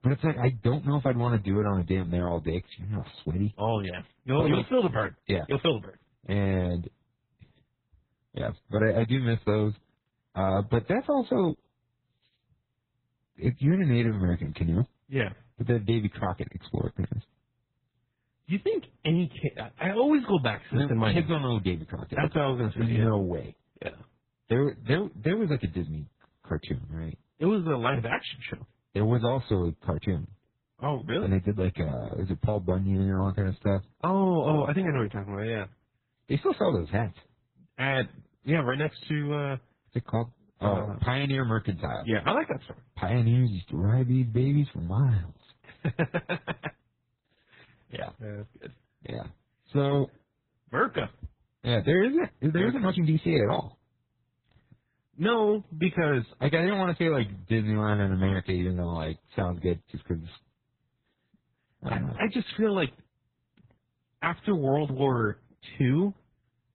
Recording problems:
garbled, watery; badly; nothing above 4 kHz
uneven, jittery; strongly; from 5 s to 1:02

